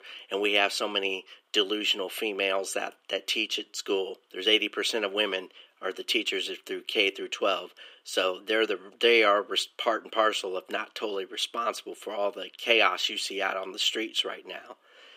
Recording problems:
thin; very; fading below 300 Hz

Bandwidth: 15.5 kHz